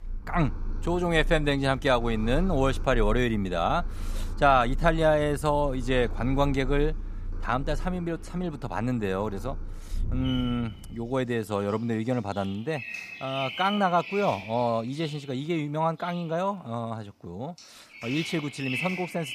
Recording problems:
animal sounds; loud; throughout; 10 dB below the speech

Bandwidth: 15 kHz